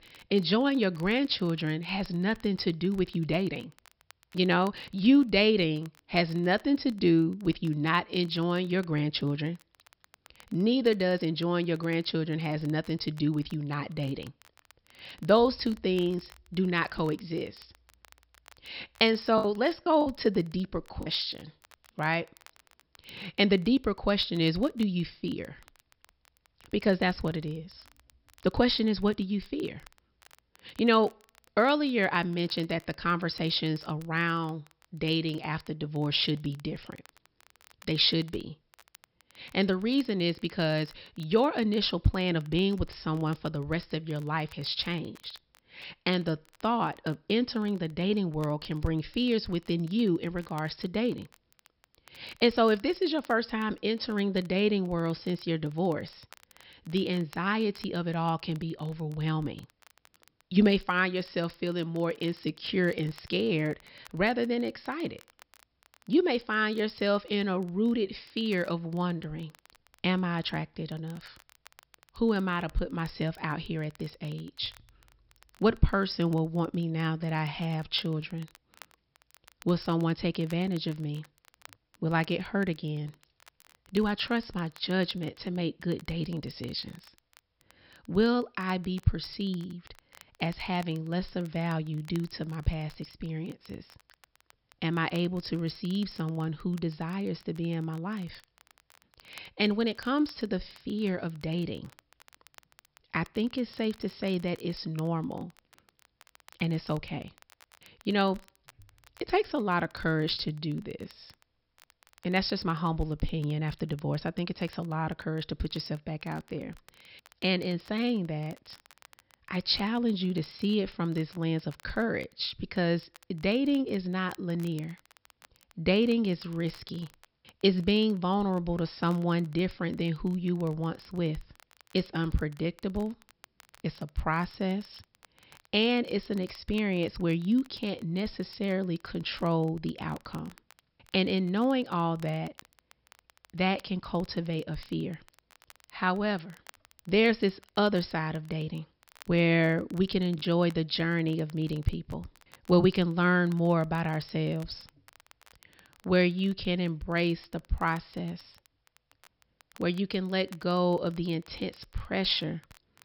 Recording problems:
high frequencies cut off; noticeable; nothing above 5.5 kHz
crackle, like an old record; faint; 30 dB below the speech
choppy; occasionally; from 19 to 21 s and at 2:30; 3% of the speech affected

